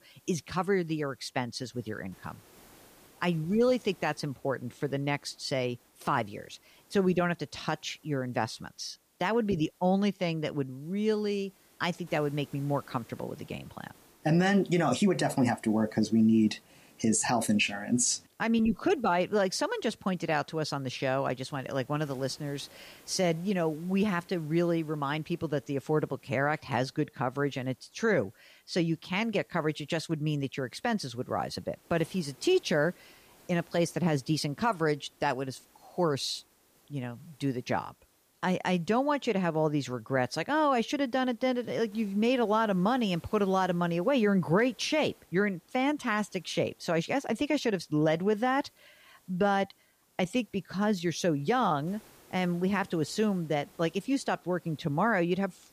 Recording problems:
hiss; faint; throughout; 30 dB below the speech

